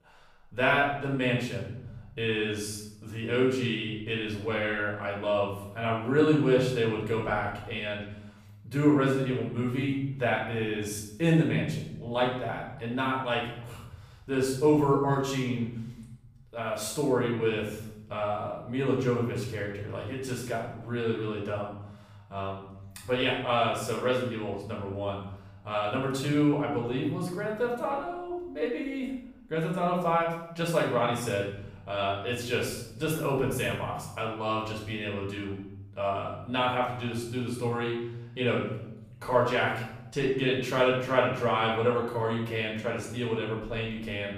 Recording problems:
off-mic speech; far
room echo; noticeable; dies away in 0.9 s

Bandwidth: 15 kHz